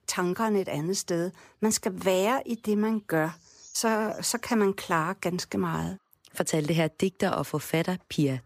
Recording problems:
animal sounds; faint; throughout; 25 dB below the speech

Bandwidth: 15 kHz